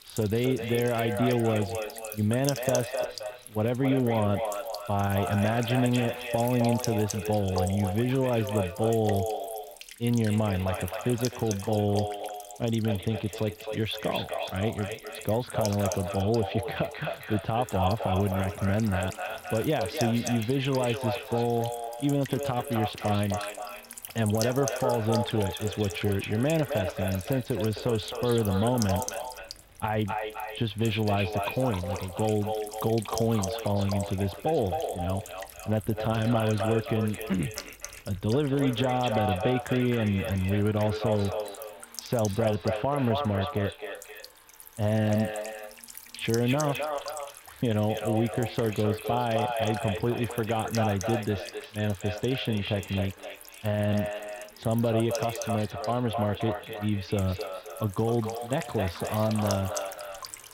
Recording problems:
echo of what is said; strong; throughout; 260 ms later, 7 dB below the speech
muffled; very; fading above 4 kHz
electrical hum; noticeable; throughout; 50 Hz, 15 dB below the speech
household noises; faint; throughout; 25 dB below the speech

